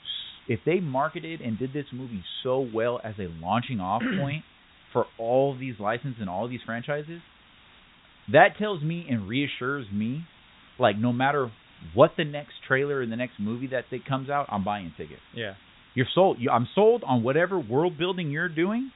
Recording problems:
high frequencies cut off; severe; nothing above 4 kHz
hiss; faint; throughout; 25 dB below the speech

